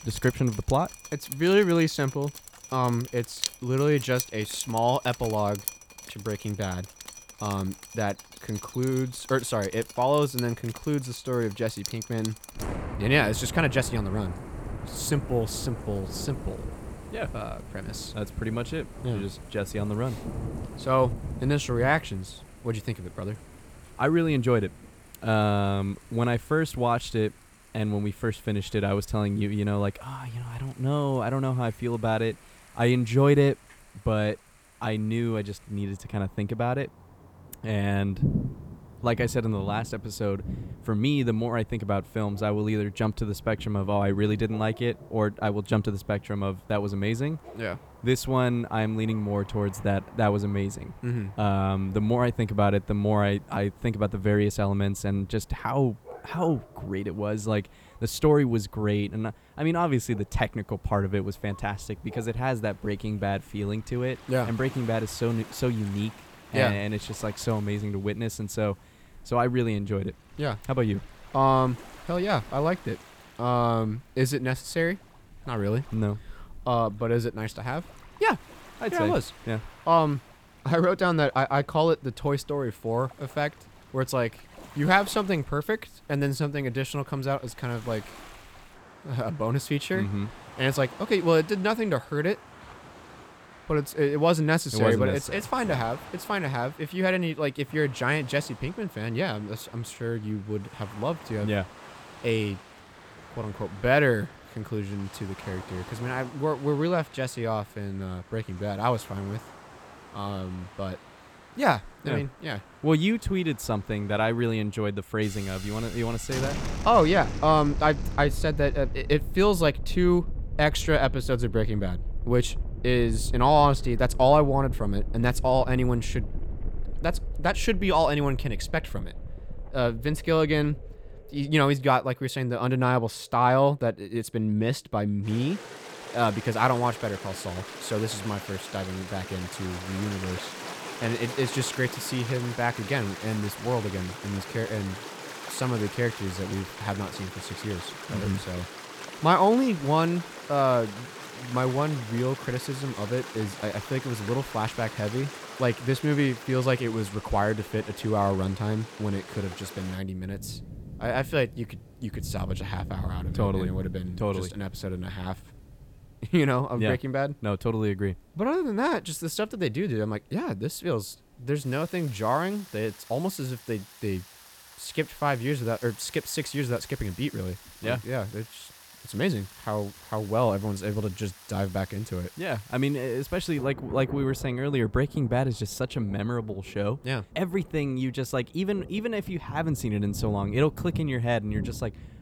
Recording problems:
rain or running water; noticeable; throughout; 15 dB below the speech

